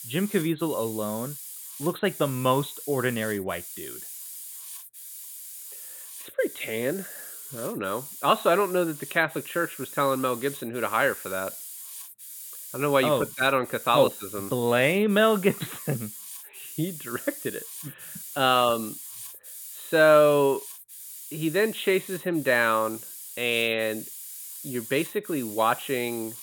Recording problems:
high frequencies cut off; severe; nothing above 4 kHz
hiss; noticeable; throughout; 10 dB below the speech

